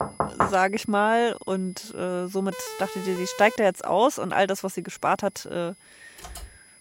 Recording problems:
high-pitched whine; faint; throughout; 10 kHz, 25 dB below the speech
door banging; noticeable; at the start; peak level with the speech
siren; faint; from 2.5 to 3.5 s; peak 10 dB below the speech
keyboard typing; faint; at 6 s; peak 15 dB below the speech

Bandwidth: 16 kHz